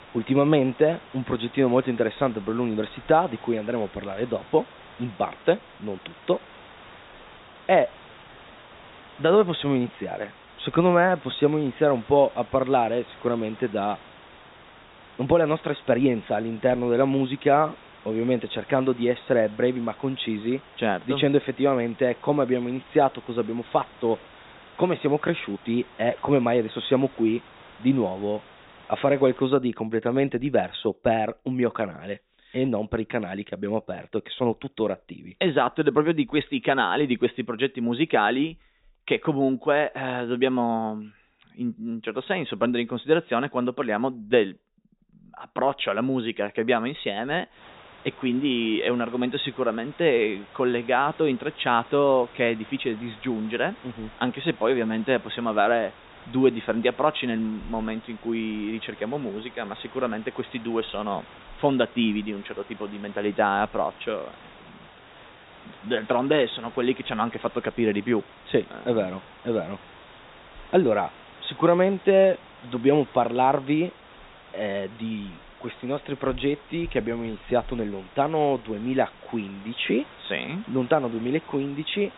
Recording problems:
high frequencies cut off; severe; nothing above 4 kHz
hiss; faint; until 29 s and from 48 s on; 20 dB below the speech

